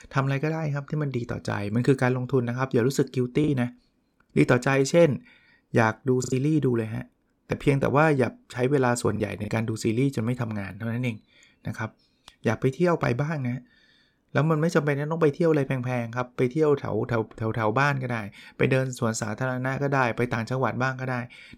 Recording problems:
choppy; very; from 3.5 to 6.5 s and at 9 s; 5% of the speech affected

